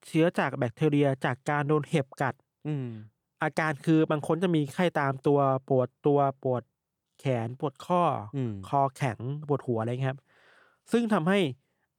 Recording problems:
none

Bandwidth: 18.5 kHz